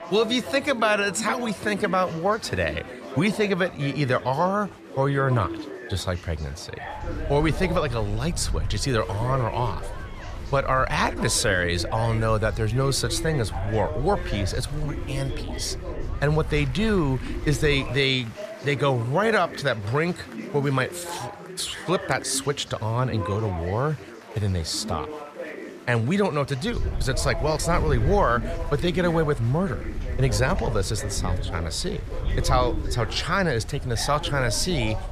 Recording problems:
chatter from many people; noticeable; throughout; 10 dB below the speech
wind noise on the microphone; occasional gusts; from 7 to 18 s and from 27 s on; 25 dB below the speech

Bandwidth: 14.5 kHz